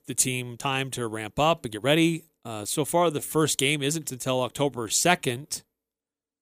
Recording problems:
uneven, jittery; strongly; from 0.5 to 5.5 s

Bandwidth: 15 kHz